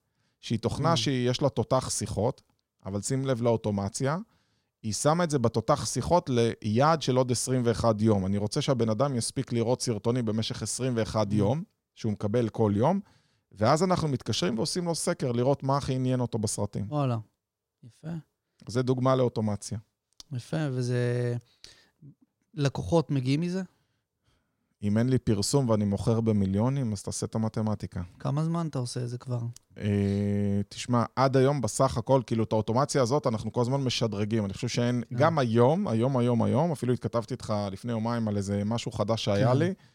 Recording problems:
none

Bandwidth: 16 kHz